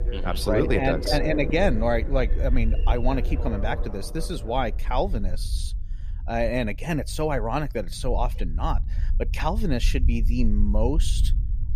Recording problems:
alarms or sirens; loud; until 4.5 s; 9 dB below the speech
low rumble; faint; throughout; 20 dB below the speech

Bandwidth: 14.5 kHz